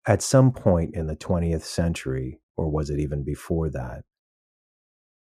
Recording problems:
muffled; slightly; fading above 1.5 kHz

